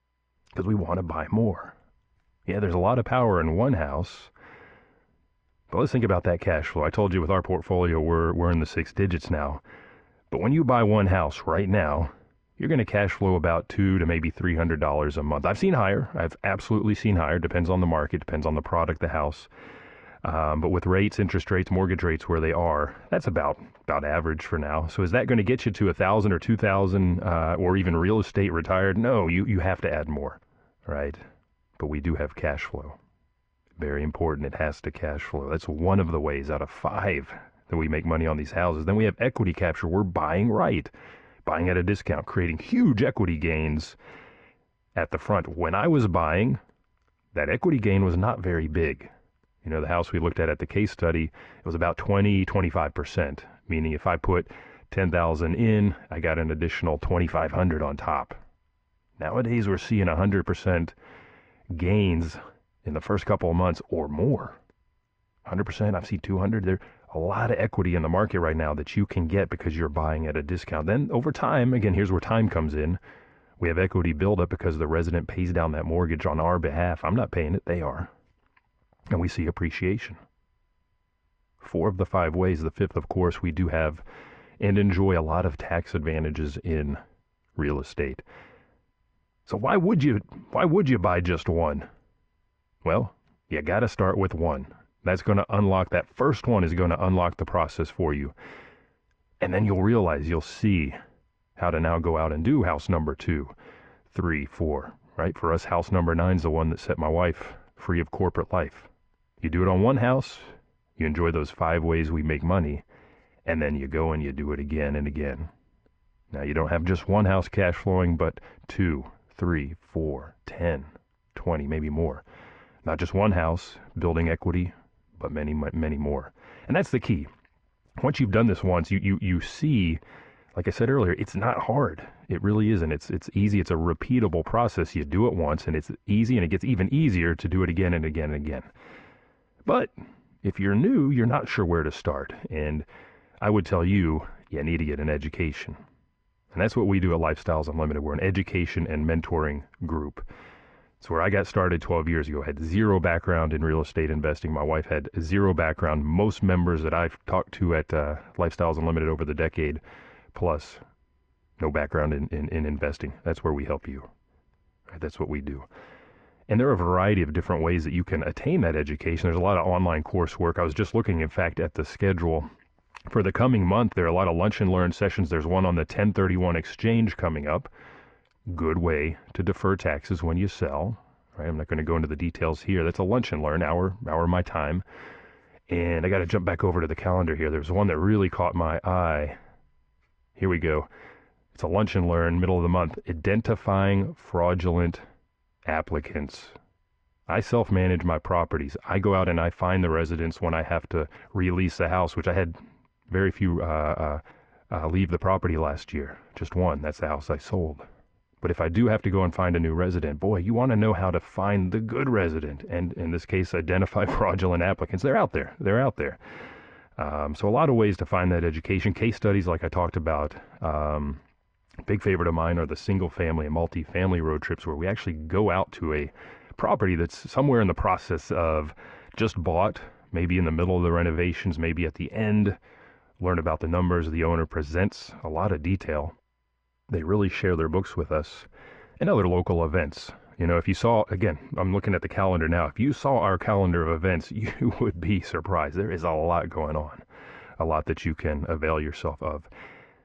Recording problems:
muffled; very; fading above 2 kHz

